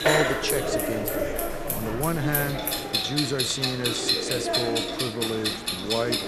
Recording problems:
household noises; very loud; throughout; 2 dB above the speech
murmuring crowd; loud; throughout; 2 dB below the speech

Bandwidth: 13.5 kHz